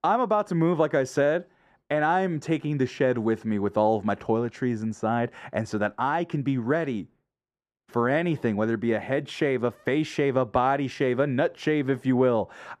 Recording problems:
muffled; very; fading above 2 kHz

